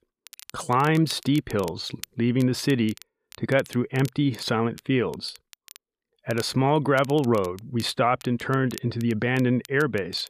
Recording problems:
crackle, like an old record; faint; 20 dB below the speech

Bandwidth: 14.5 kHz